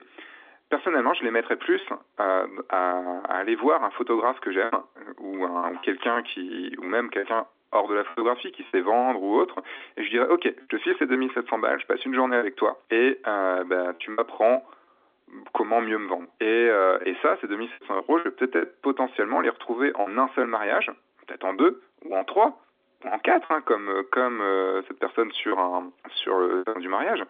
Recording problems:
phone-call audio
choppy; very; 6% of the speech affected

